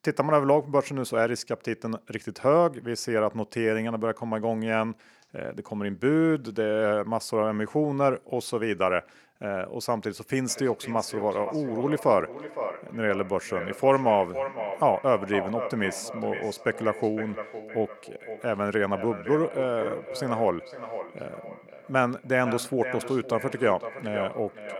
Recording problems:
echo of what is said; strong; from 10 s on; 510 ms later, 10 dB below the speech

